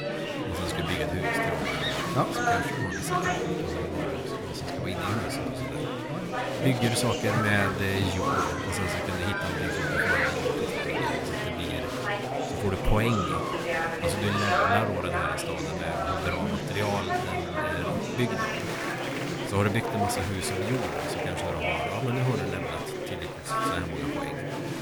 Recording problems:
murmuring crowd; very loud; throughout; 3 dB above the speech

